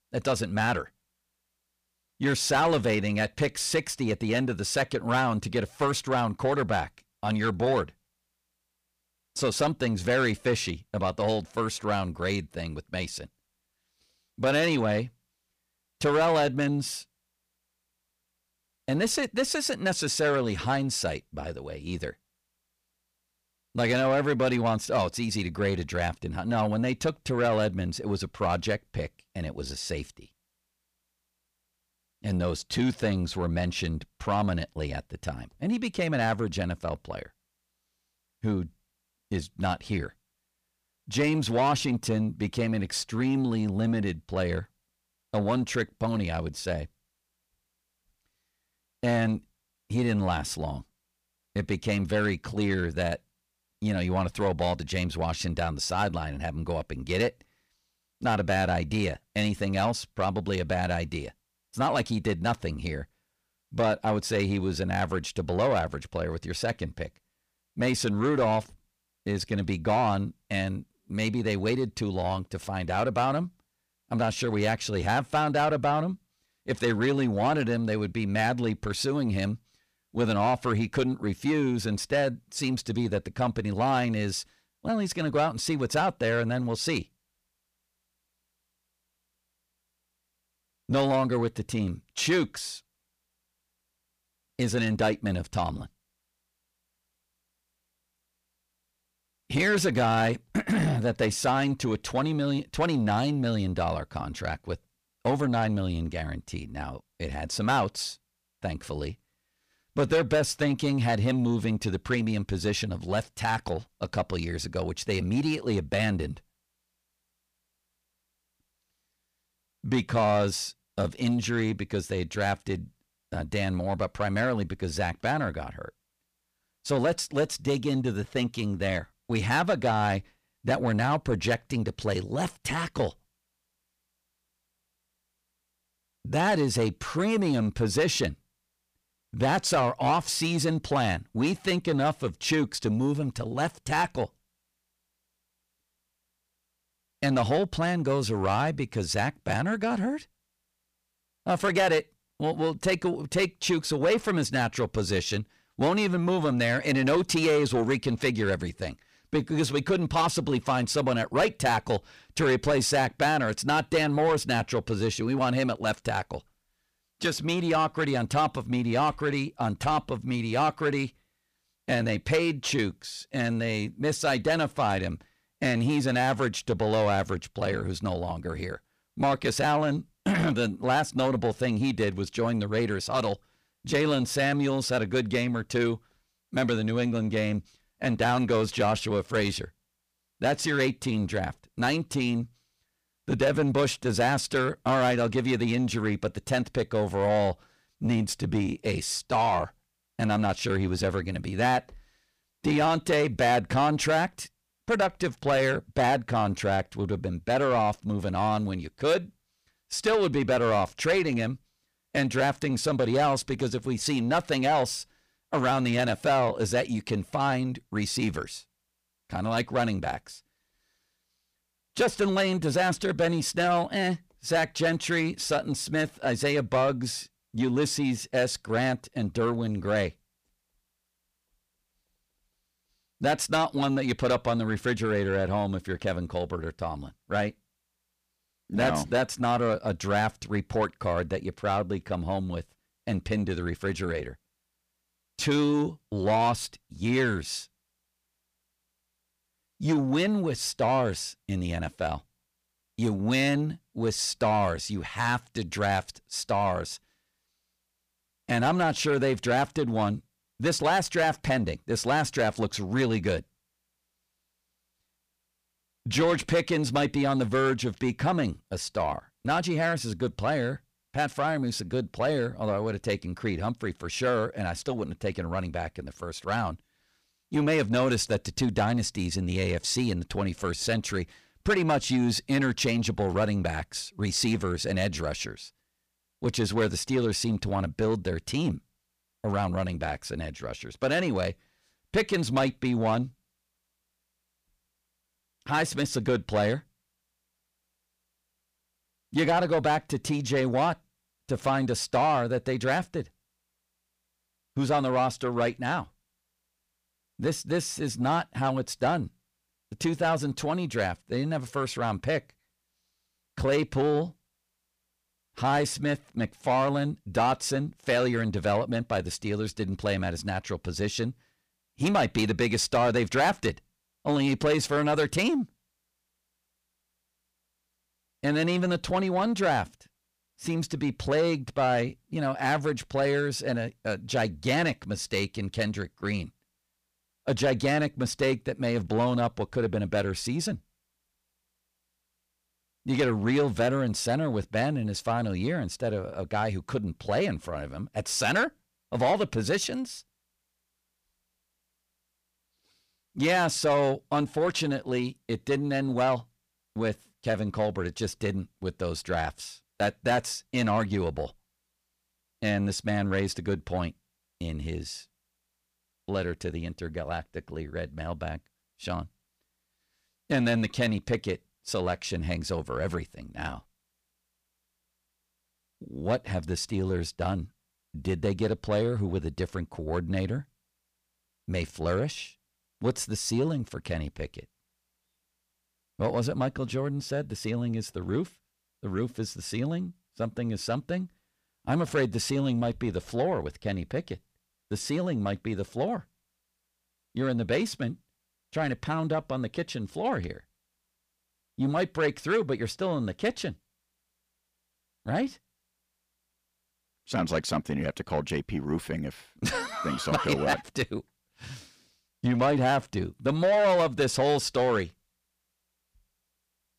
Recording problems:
distortion; slight; 10 dB below the speech

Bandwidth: 15 kHz